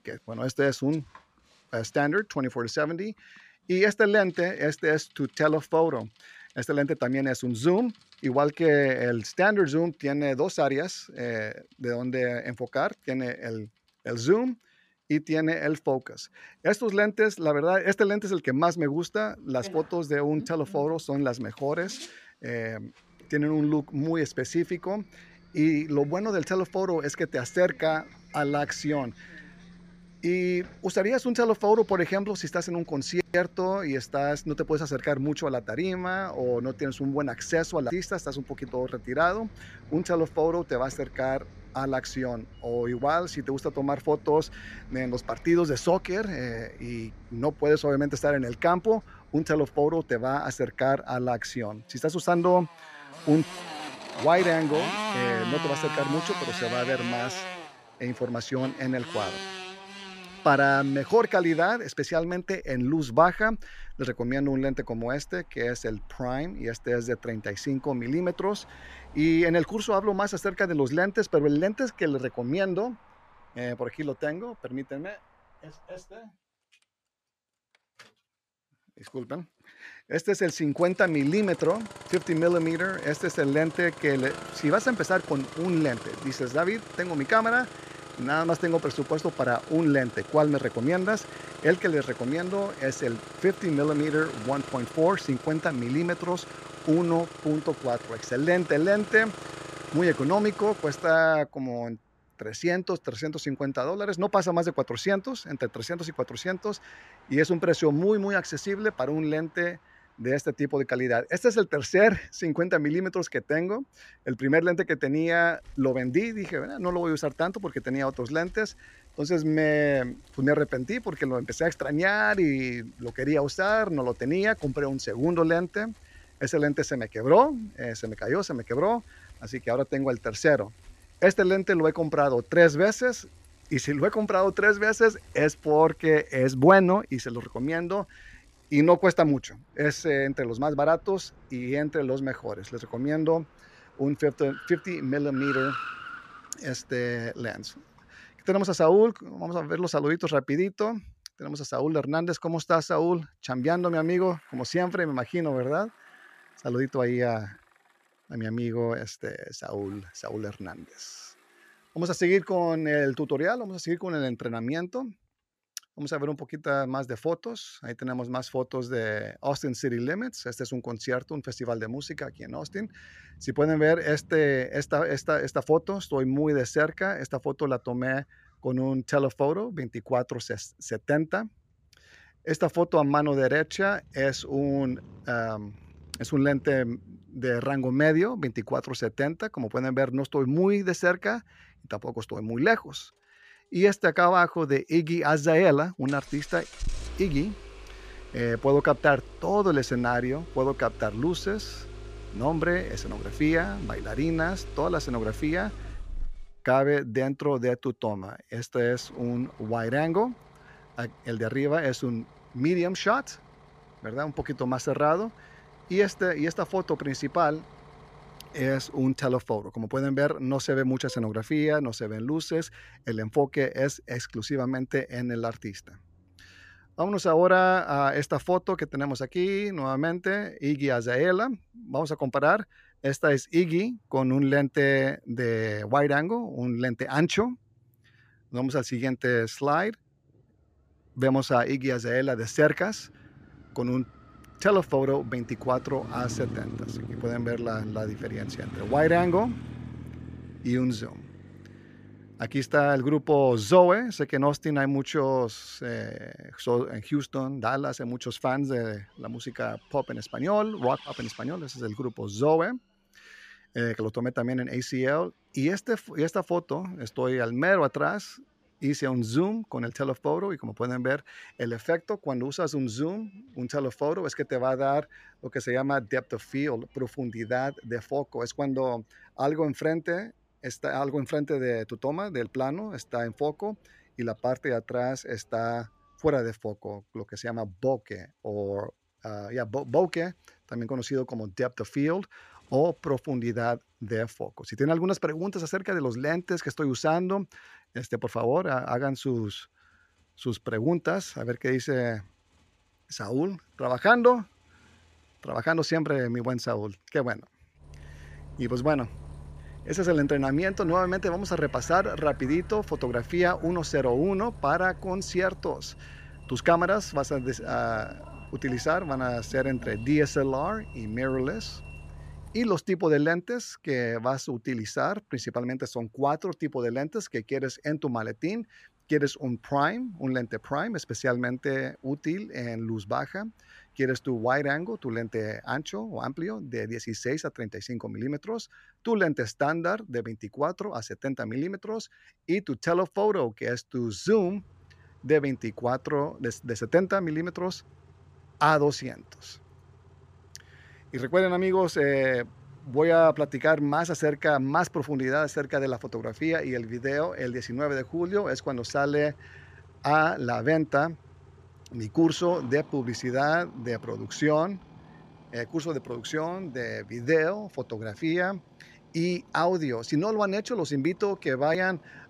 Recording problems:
traffic noise; noticeable; throughout; 15 dB below the speech

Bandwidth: 15 kHz